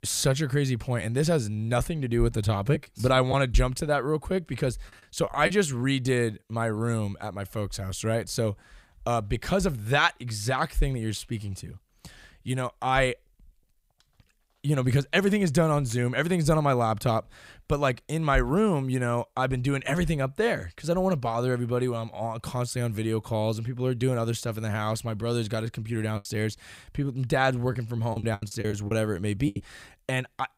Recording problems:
choppy; very; from 3 to 5.5 s and from 26 to 30 s; 9% of the speech affected

